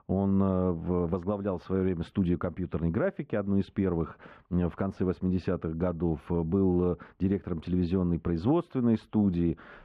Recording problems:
muffled; very; fading above 3 kHz

